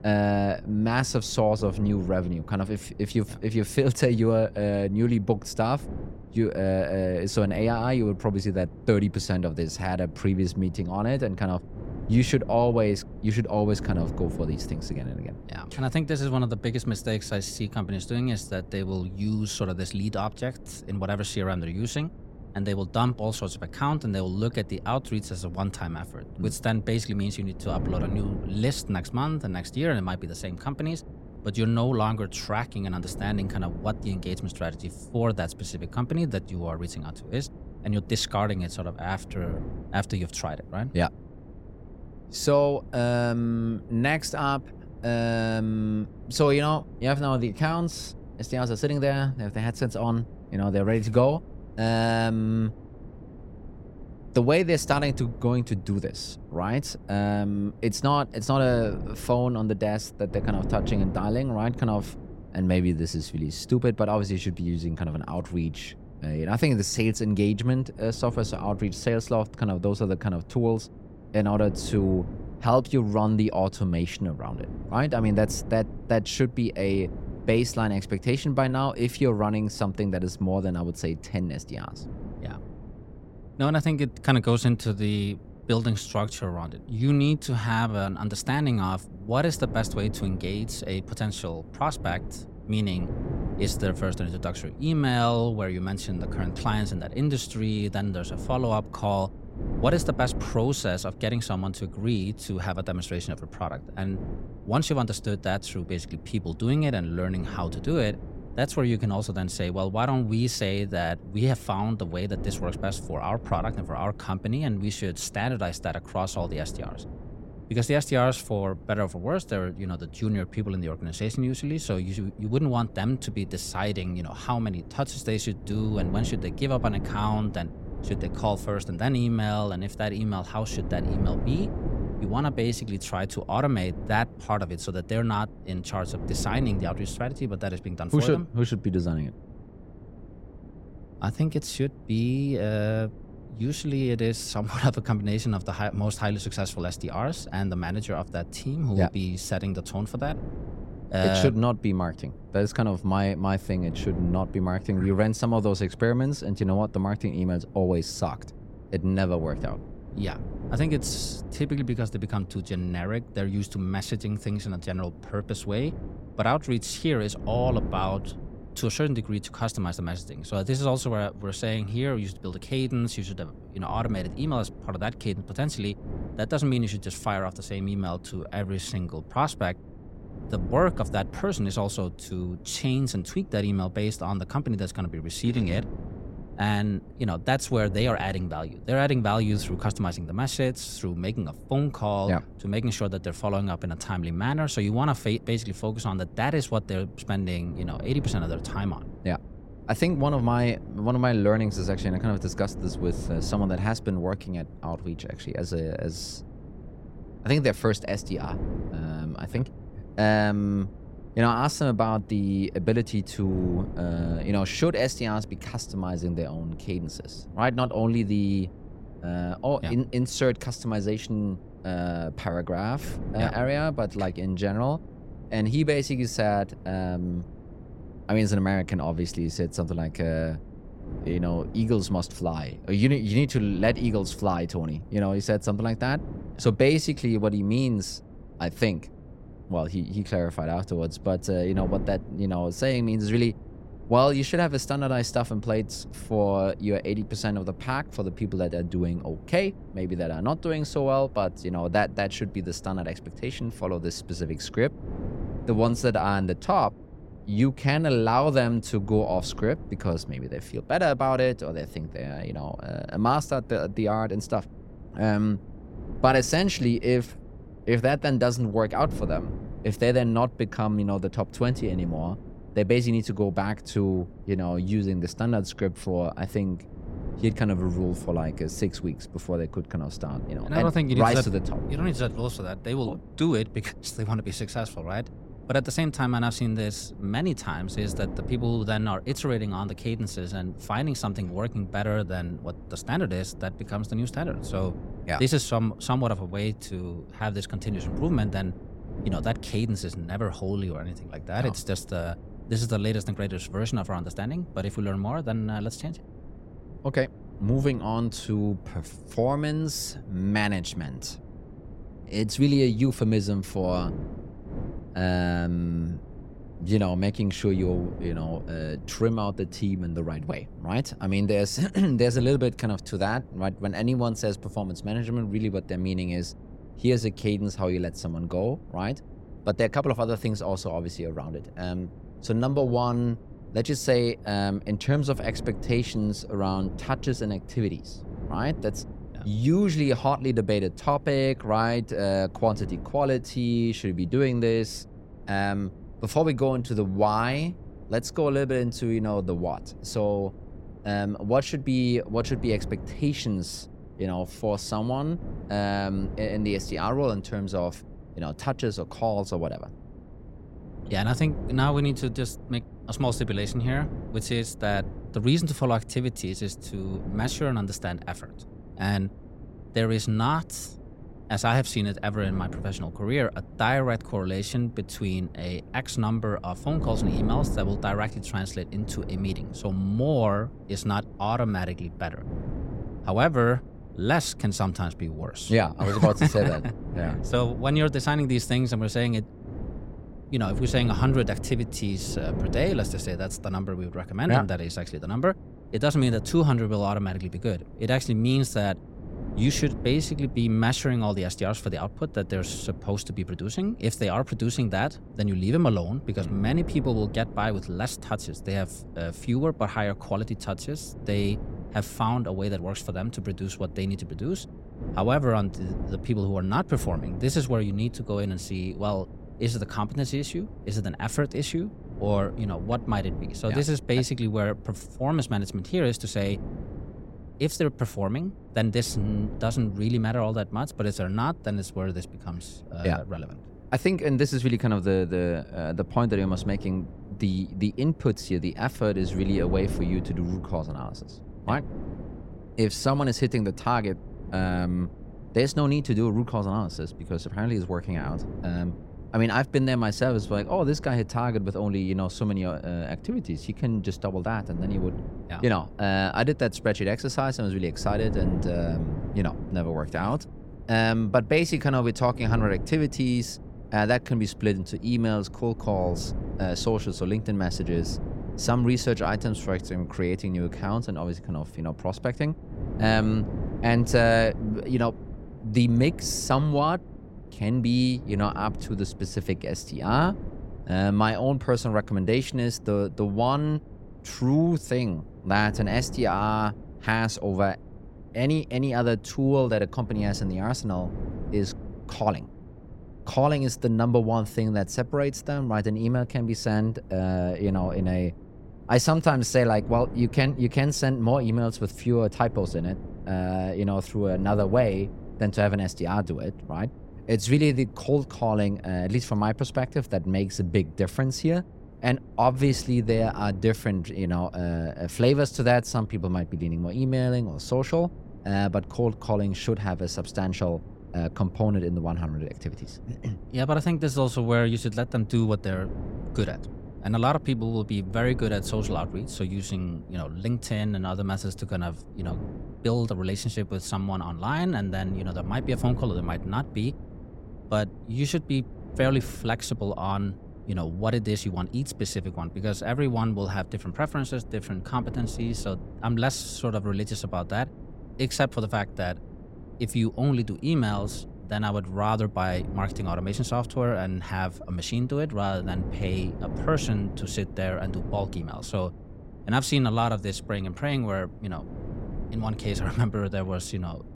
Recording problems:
wind noise on the microphone; occasional gusts; 20 dB below the speech
uneven, jittery; strongly; from 1:26 to 8:28

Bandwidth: 16 kHz